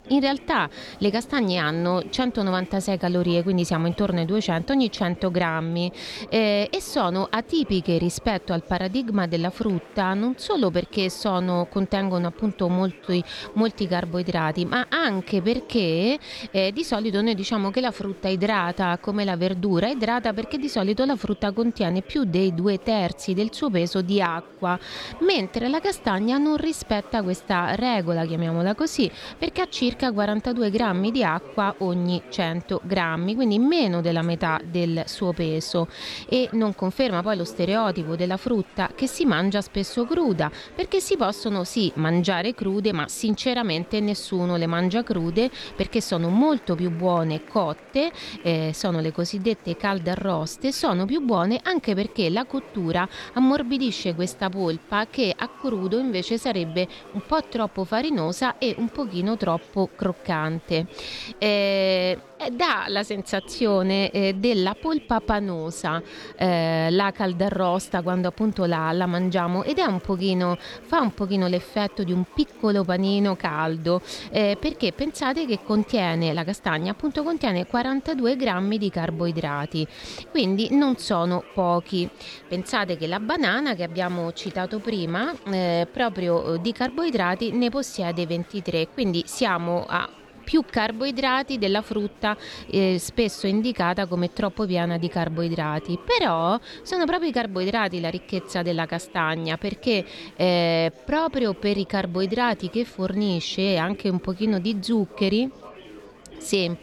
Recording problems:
murmuring crowd; faint; throughout; 20 dB below the speech

